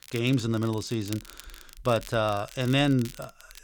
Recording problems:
crackle, like an old record; noticeable; 20 dB below the speech

